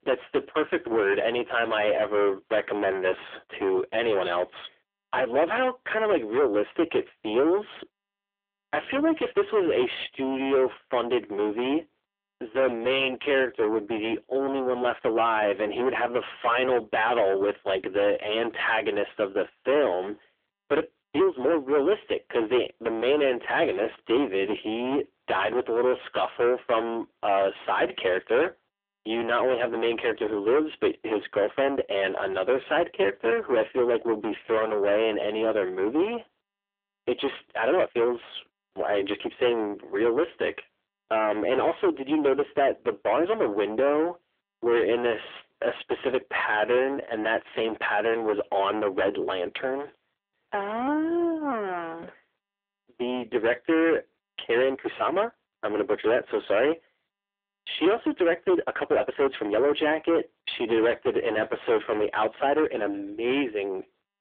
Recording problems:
phone-call audio; poor line; nothing above 3.5 kHz
distortion; heavy; 8 dB below the speech
uneven, jittery; strongly; from 1 s to 1:03

